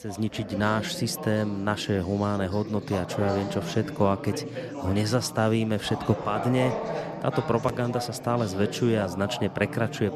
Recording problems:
background chatter; loud; throughout; 4 voices, 8 dB below the speech

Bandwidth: 13.5 kHz